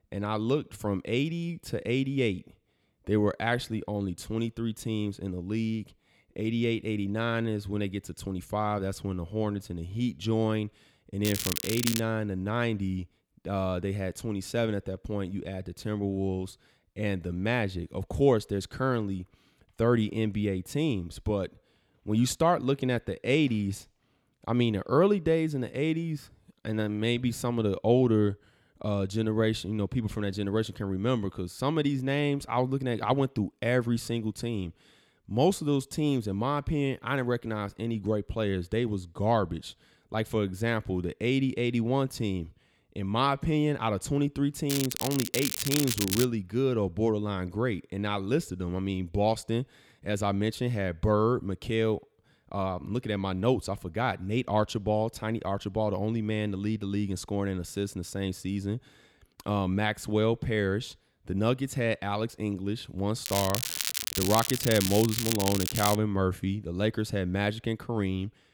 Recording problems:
crackling; loud; at 11 s, from 45 to 46 s and from 1:03 to 1:06; 1 dB below the speech

